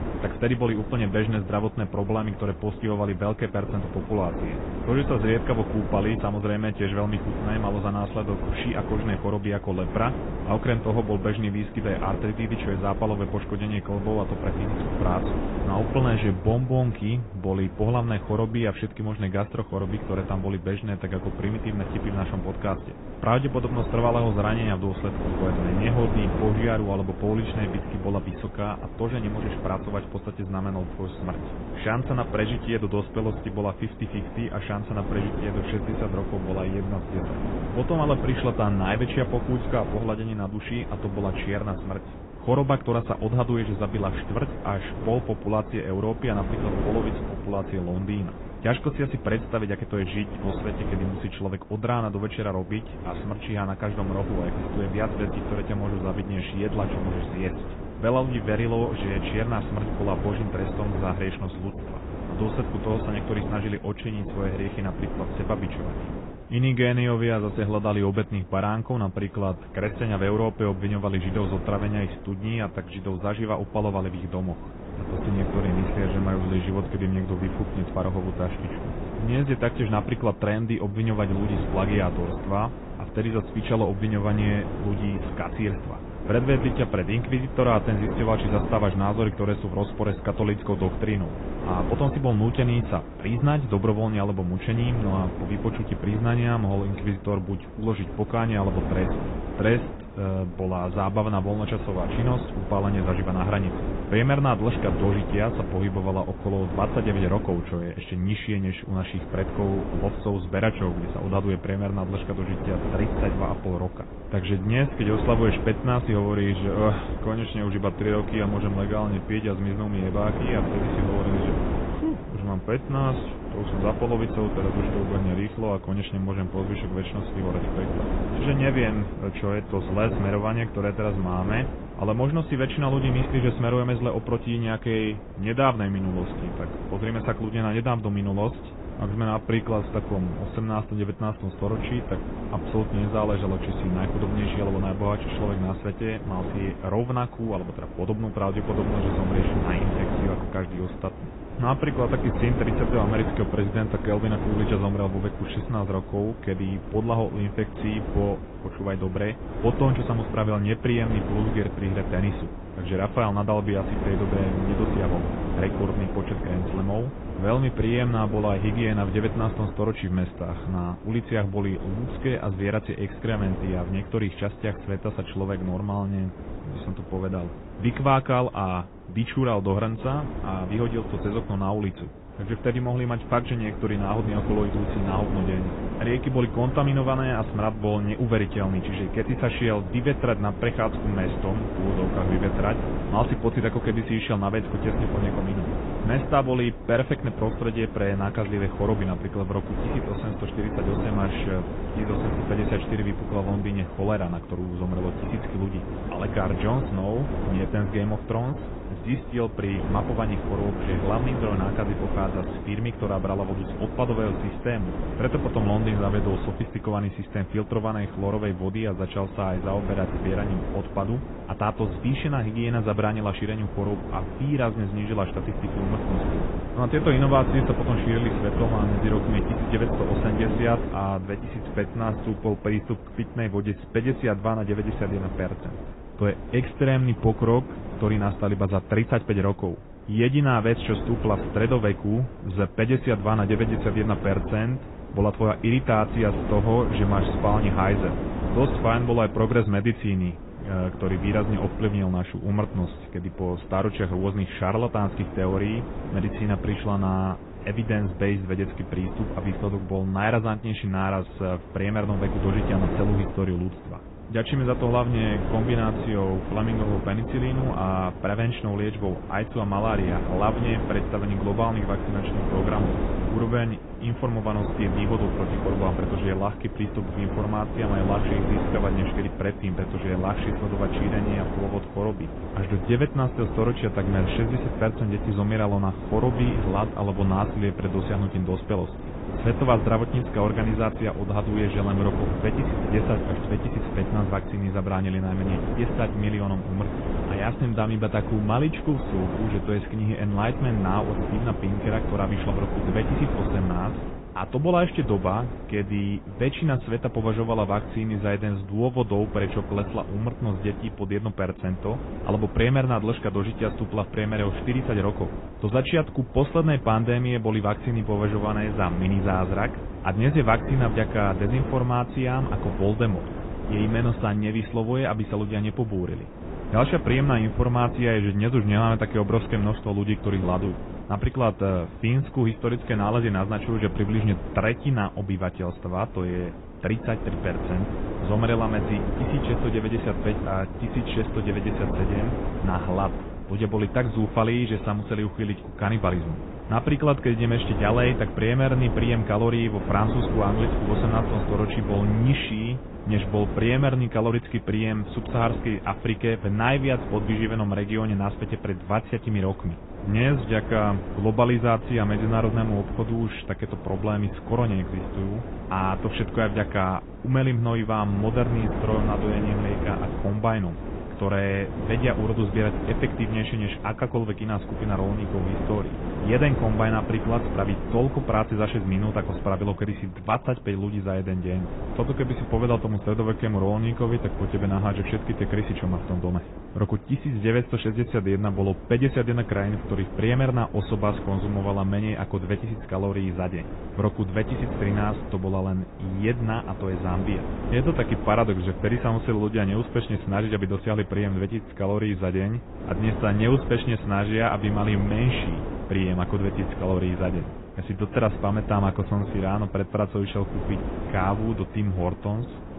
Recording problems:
high frequencies cut off; severe; nothing above 3.5 kHz
garbled, watery; slightly
wind noise on the microphone; heavy; 8 dB below the speech

